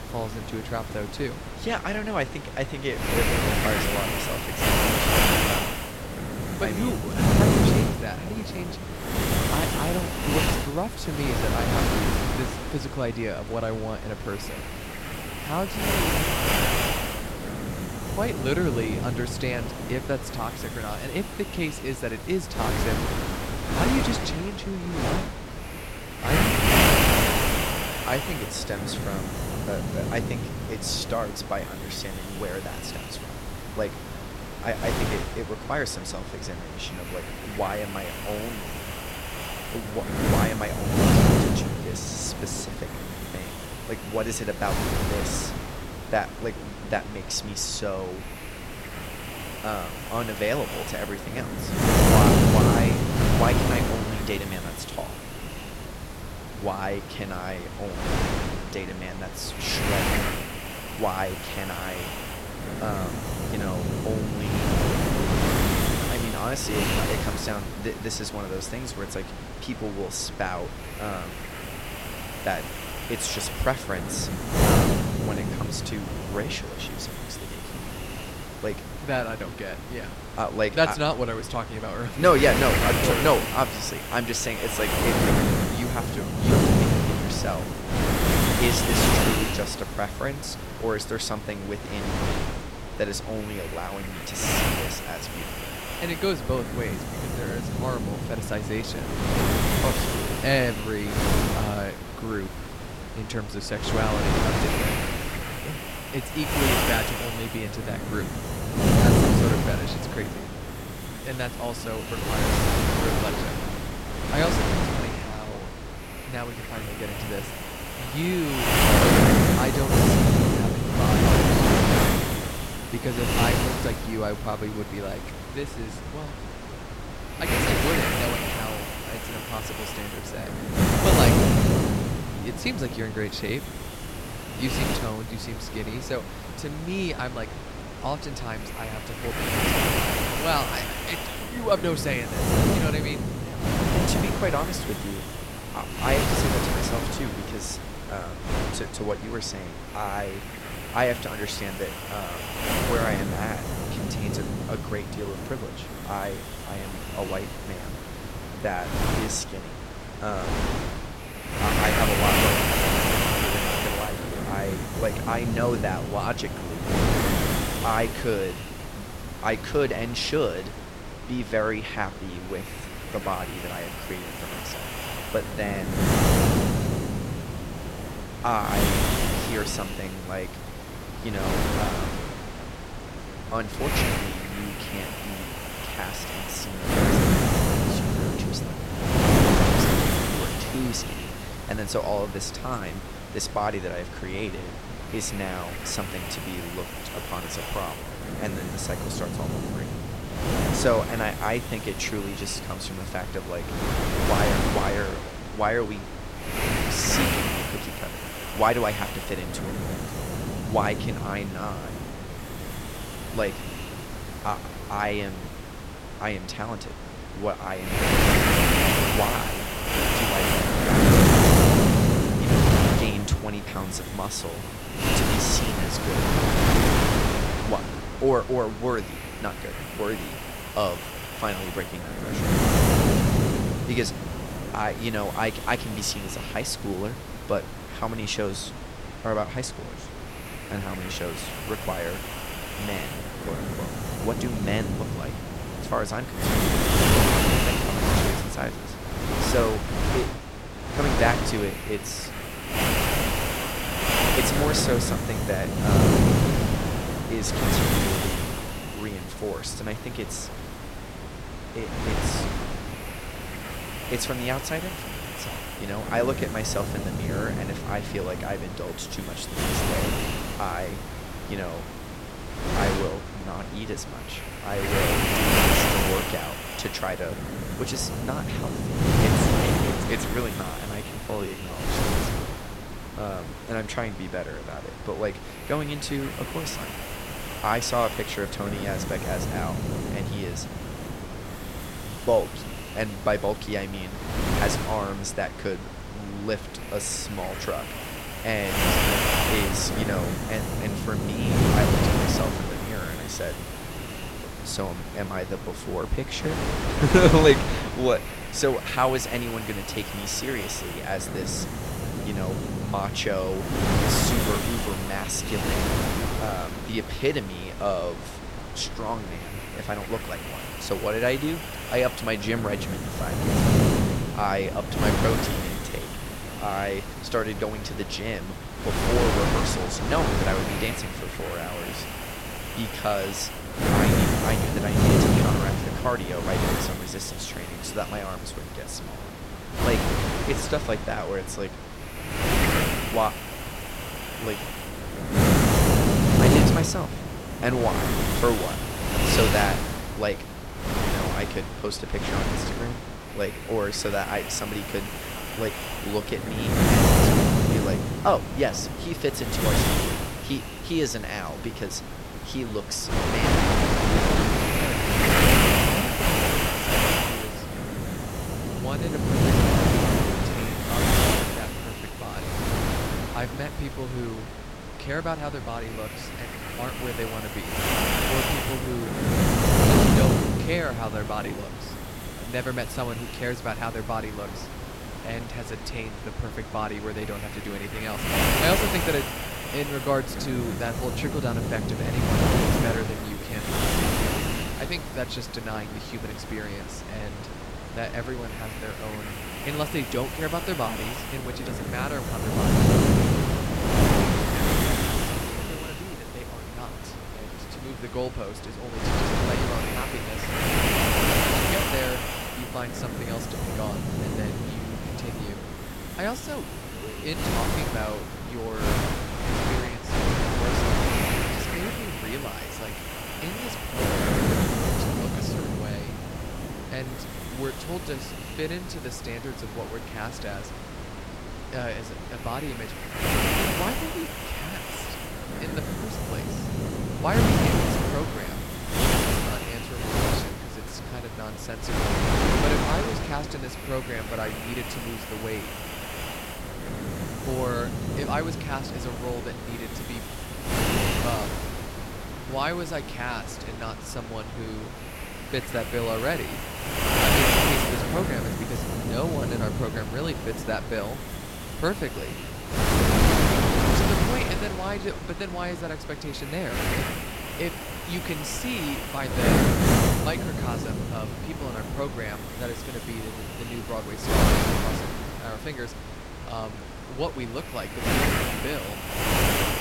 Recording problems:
wind noise on the microphone; heavy; 3 dB above the speech

